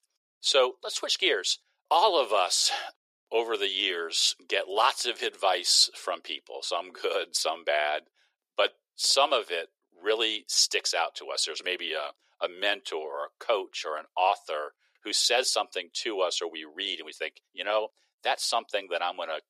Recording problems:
thin; very; fading below 400 Hz

